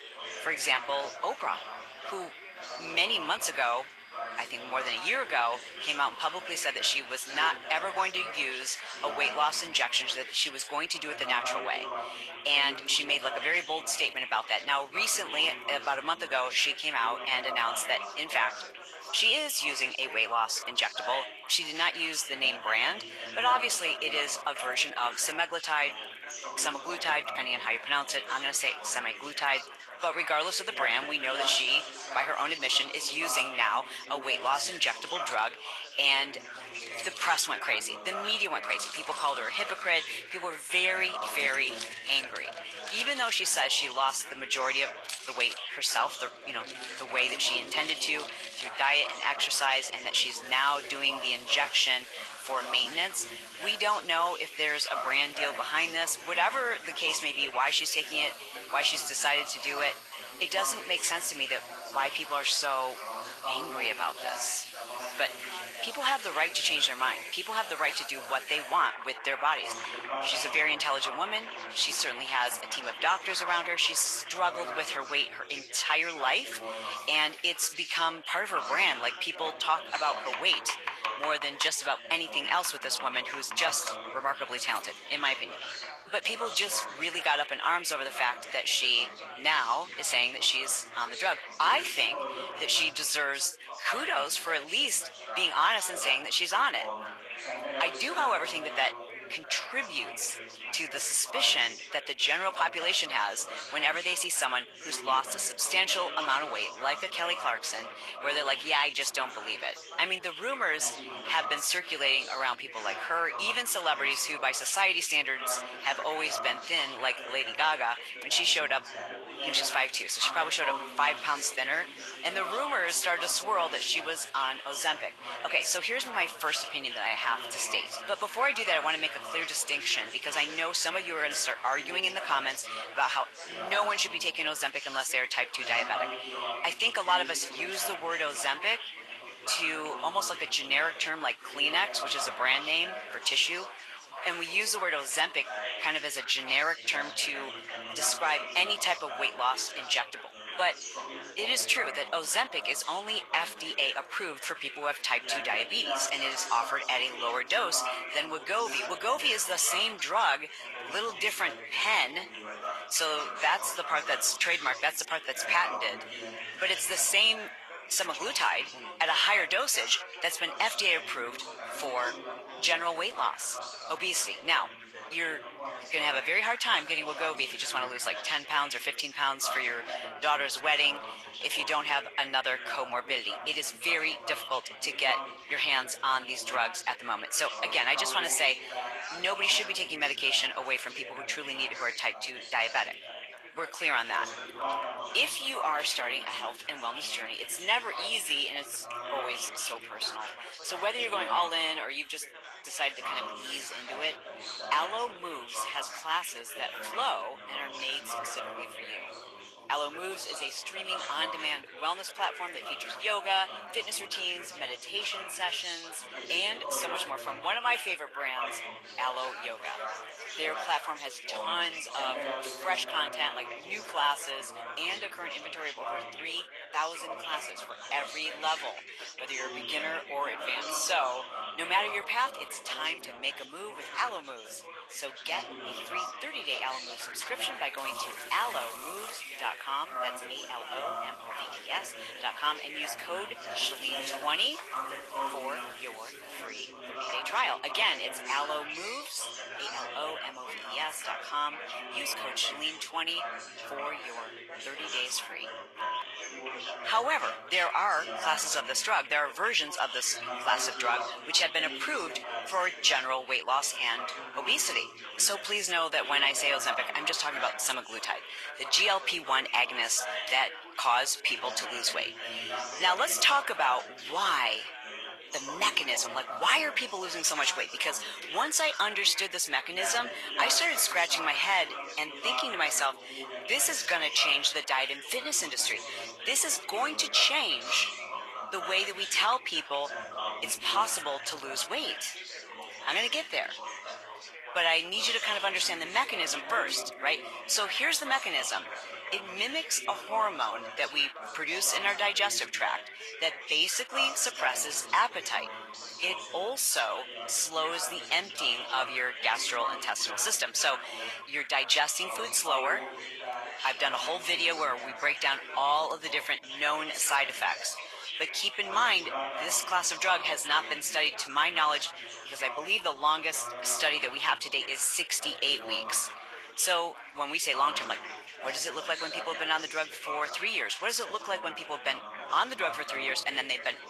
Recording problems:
thin; very; fading below 900 Hz
garbled, watery; slightly; nothing above 12 kHz
household noises; noticeable; throughout; 15 dB below the speech
background chatter; noticeable; throughout; 4 voices, 10 dB below the speech

